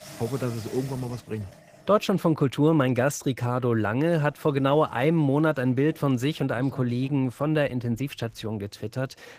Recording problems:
garbled, watery; slightly; nothing above 15 kHz
household noises; faint; throughout; 20 dB below the speech

